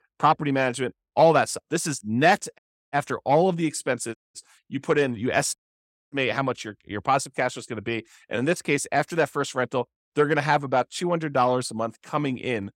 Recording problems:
audio cutting out; at 2.5 s, at 4 s and at 5.5 s for 0.5 s

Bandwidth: 16 kHz